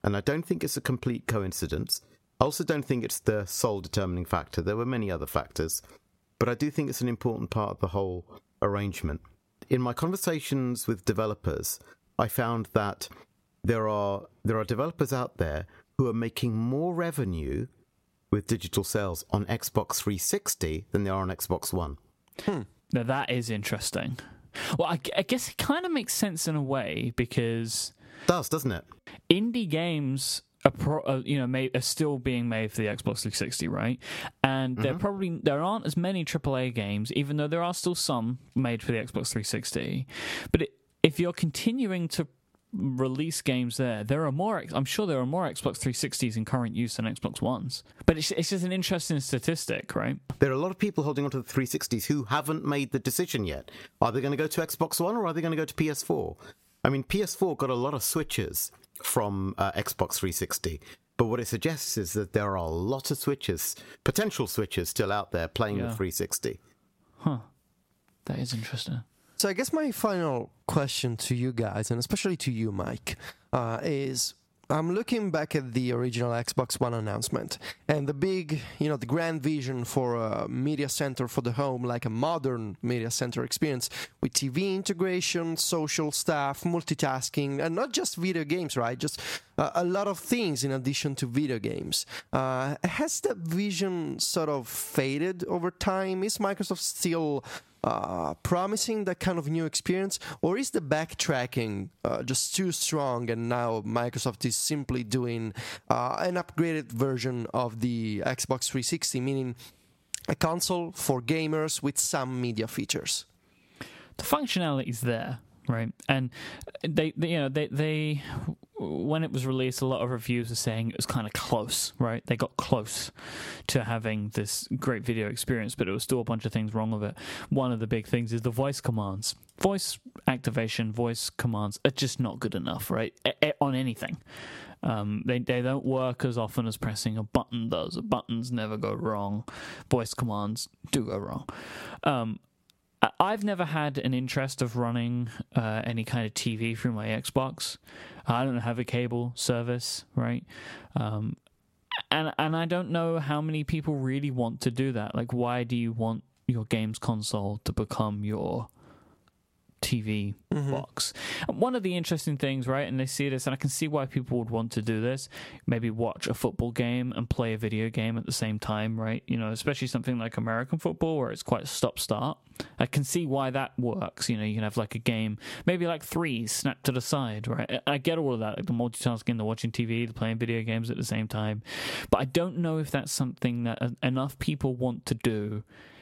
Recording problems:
squashed, flat; somewhat

